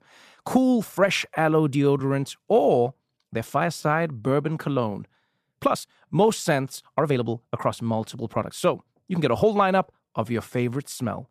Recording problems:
uneven, jittery; strongly; from 1 to 11 s

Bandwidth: 14.5 kHz